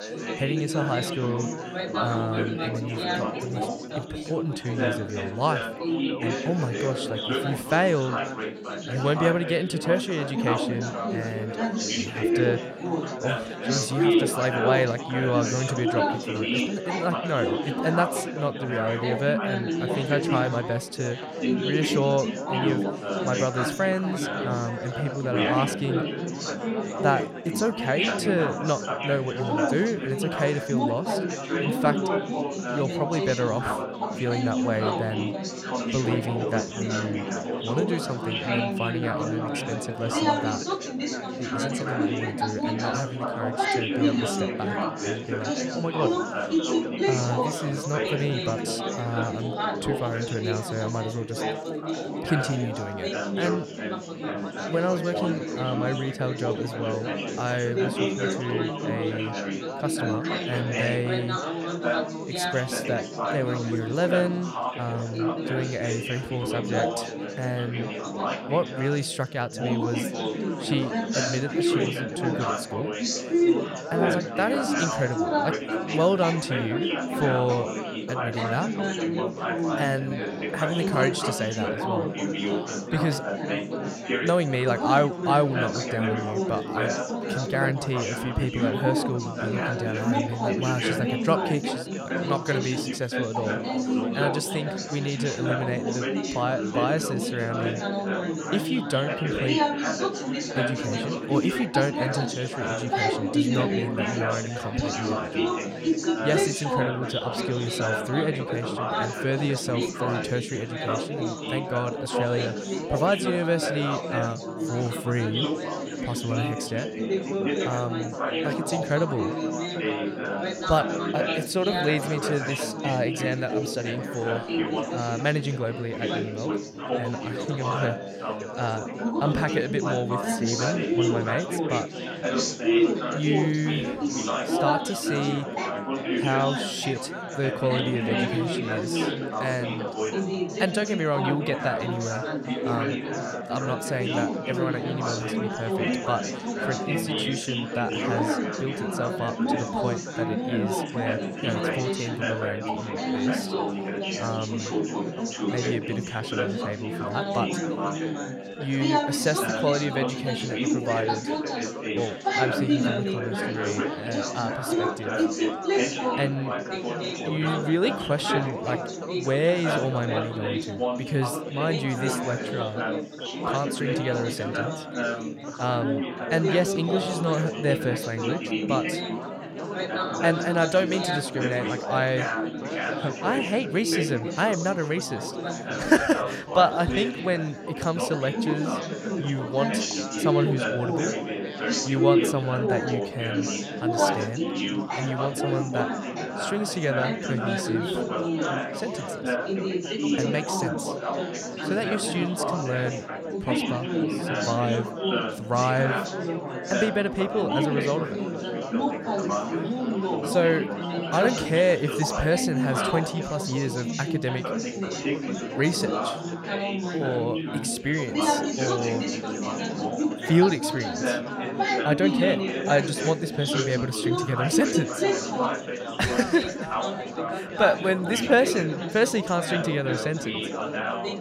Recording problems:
chatter from many people; very loud; throughout; as loud as the speech

